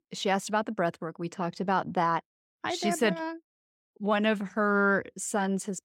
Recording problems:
none

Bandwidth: 16 kHz